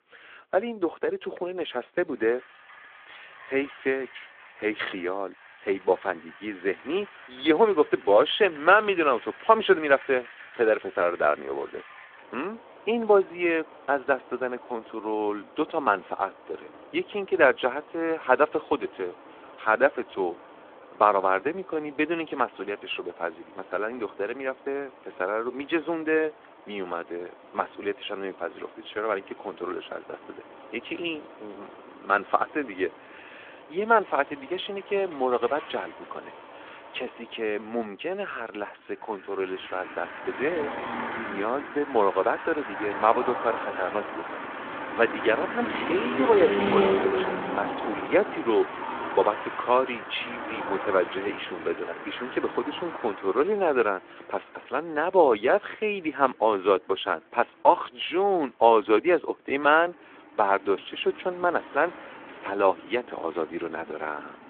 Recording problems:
phone-call audio; nothing above 3.5 kHz
traffic noise; loud; throughout; 9 dB below the speech

